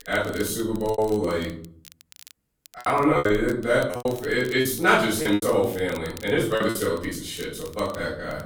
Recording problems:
off-mic speech; far
room echo; noticeable; dies away in 0.5 s
crackle, like an old record; faint; 25 dB below the speech
choppy; very; 10% of the speech affected

